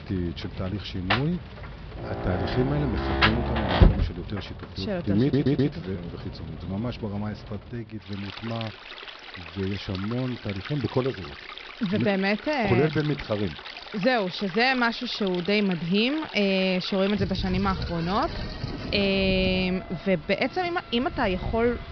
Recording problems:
high frequencies cut off; noticeable; nothing above 5.5 kHz
rain or running water; loud; throughout; 6 dB below the speech
audio stuttering; at 5 s

